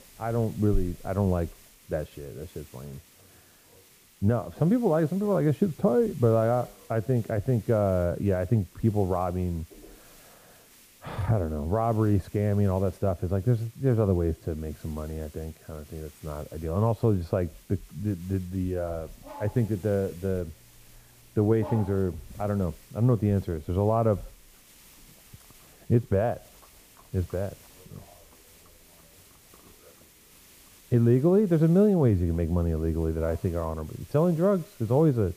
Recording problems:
muffled; very; fading above 1.5 kHz
animal sounds; faint; from 19 s on; 25 dB below the speech
hiss; faint; throughout; 25 dB below the speech

